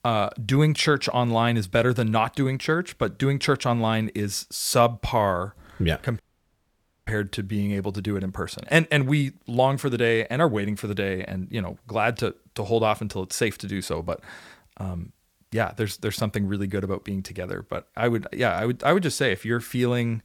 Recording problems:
audio cutting out; at 6 s for 1 s

